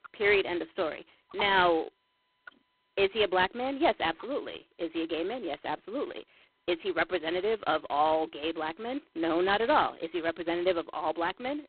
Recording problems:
phone-call audio; poor line; nothing above 3.5 kHz

